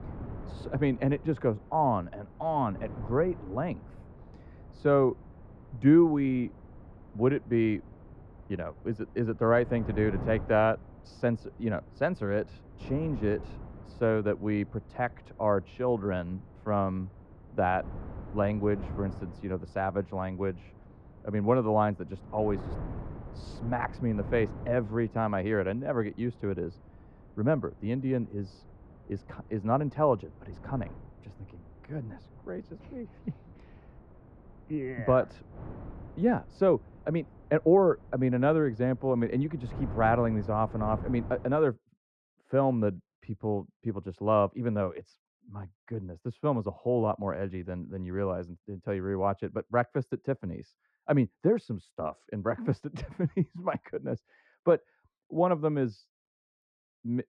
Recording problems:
muffled; very; fading above 1 kHz
wind noise on the microphone; occasional gusts; until 42 s; 20 dB below the speech

